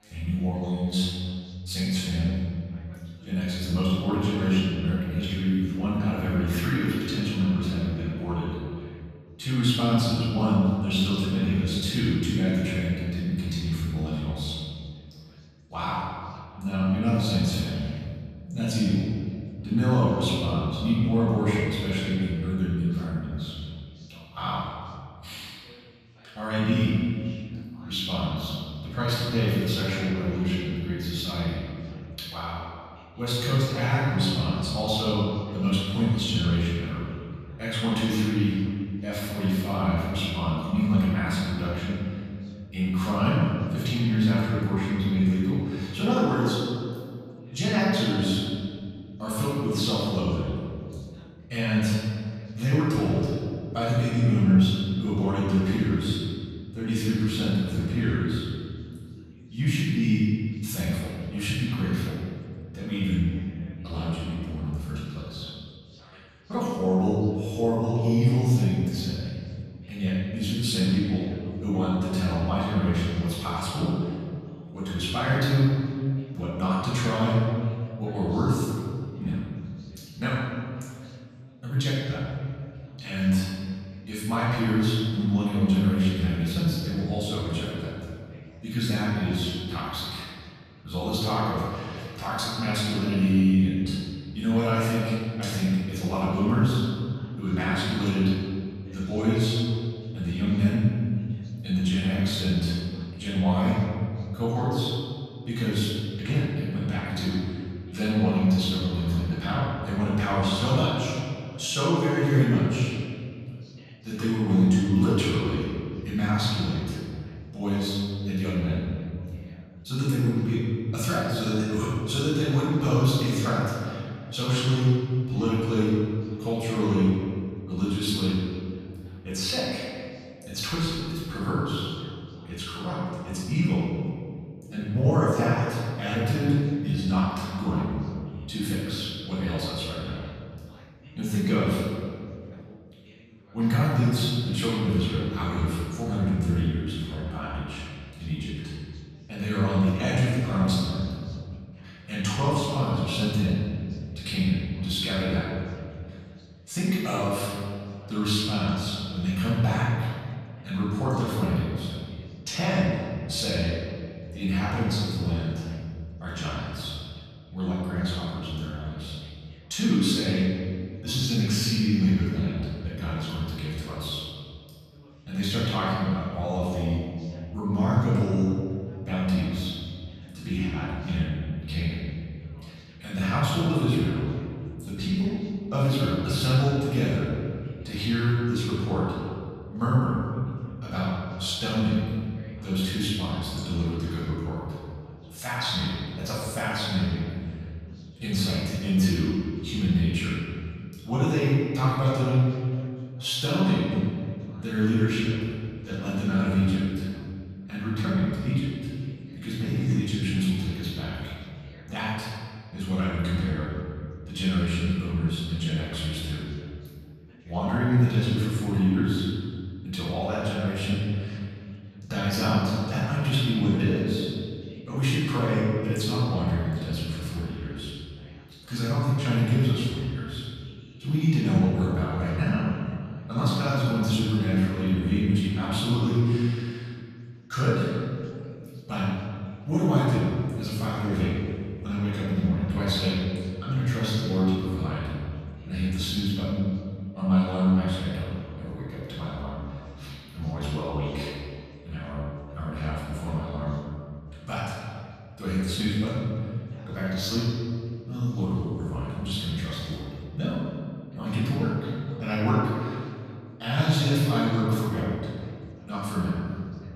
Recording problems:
room echo; strong; dies away in 2 s
off-mic speech; far
background chatter; faint; throughout; 3 voices, 30 dB below the speech

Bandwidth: 14.5 kHz